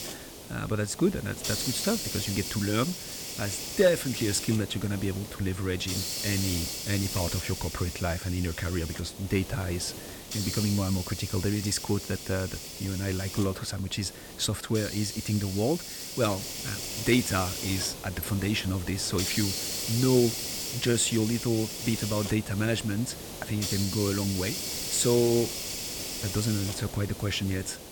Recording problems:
hiss; loud; throughout; 5 dB below the speech

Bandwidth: 18 kHz